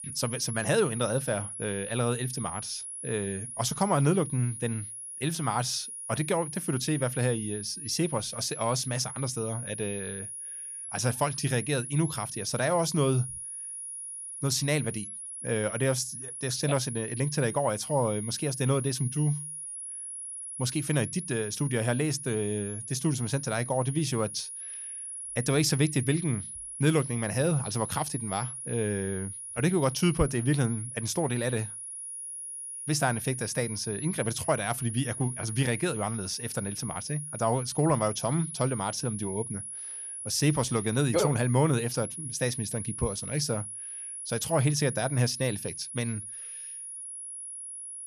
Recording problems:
high-pitched whine; loud; throughout; 10.5 kHz, 7 dB below the speech

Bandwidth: 13.5 kHz